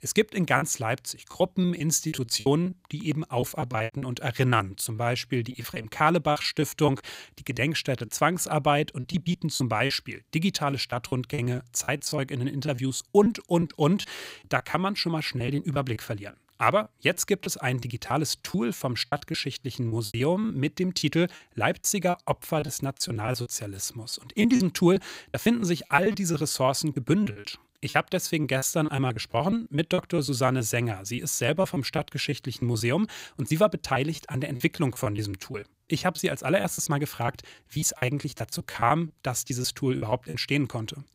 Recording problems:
choppy; very; 12% of the speech affected

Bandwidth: 15.5 kHz